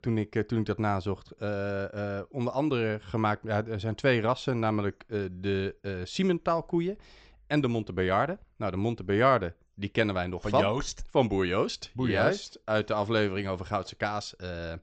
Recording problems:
high frequencies cut off; noticeable; nothing above 8 kHz

